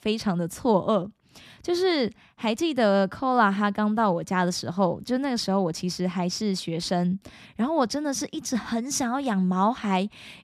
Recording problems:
none

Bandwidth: 14.5 kHz